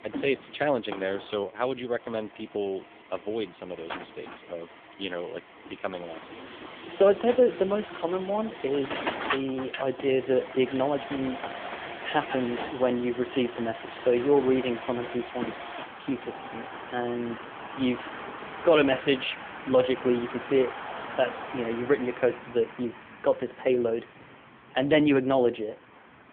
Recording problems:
phone-call audio; poor line; nothing above 3.5 kHz
traffic noise; noticeable; throughout; 10 dB below the speech

